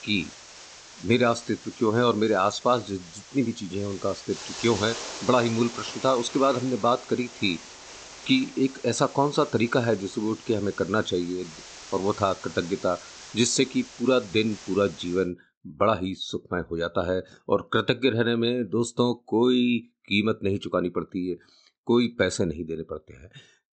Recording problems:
high frequencies cut off; noticeable; nothing above 8 kHz
hiss; noticeable; until 15 s; 15 dB below the speech

